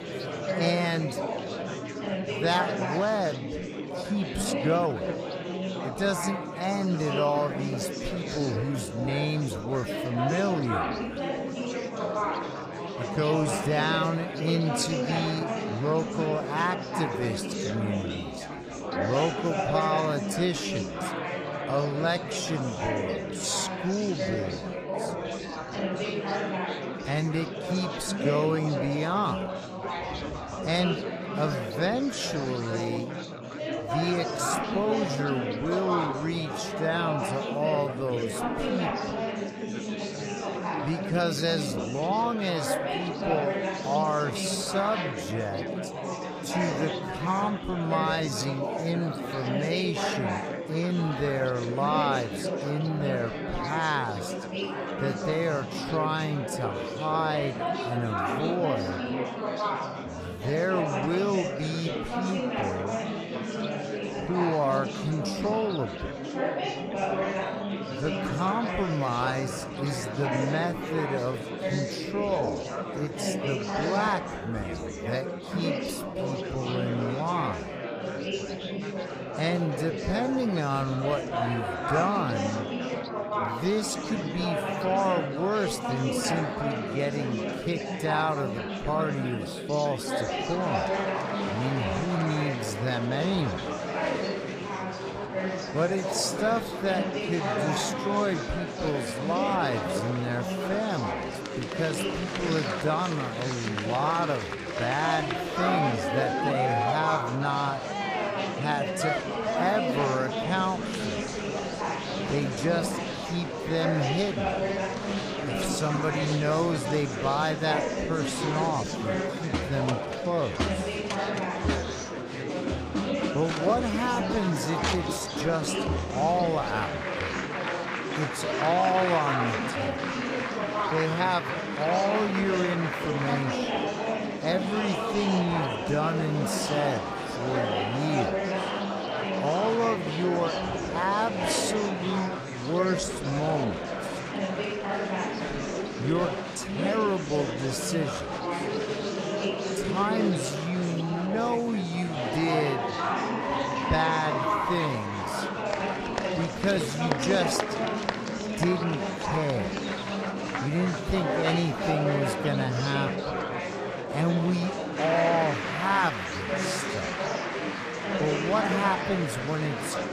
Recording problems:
wrong speed, natural pitch; too slow; 0.6 times normal speed
murmuring crowd; loud; throughout; 1 dB below the speech

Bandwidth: 15 kHz